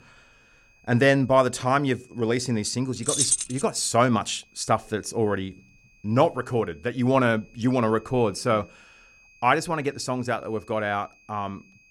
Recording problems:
high-pitched whine; faint; throughout; 2.5 kHz, 30 dB below the speech
jangling keys; loud; at 3 s; peak 3 dB above the speech

